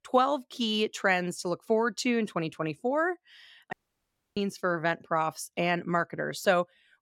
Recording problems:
audio cutting out; at 3.5 s for 0.5 s

